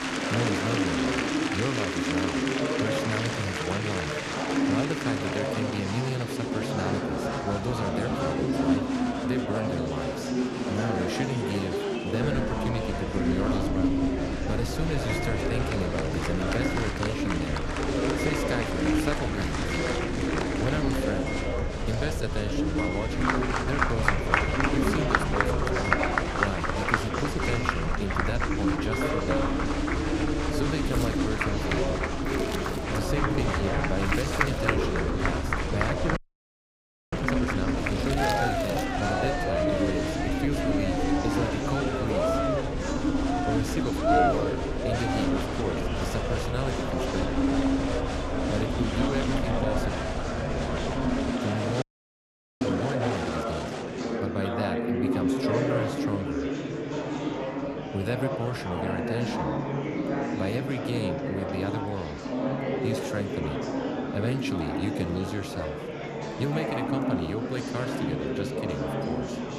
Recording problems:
murmuring crowd; very loud; throughout; 5 dB above the speech
household noises; loud; throughout; 9 dB below the speech
low rumble; noticeable; from 12 to 51 s; 15 dB below the speech
animal sounds; faint; throughout; 25 dB below the speech
audio freezing; at 36 s for 1 s and at 52 s for 1 s

